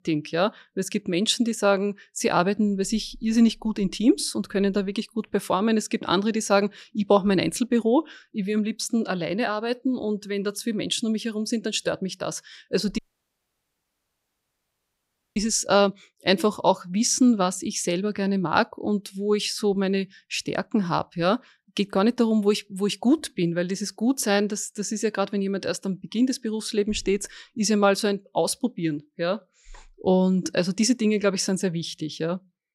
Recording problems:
audio cutting out; at 13 s for 2.5 s

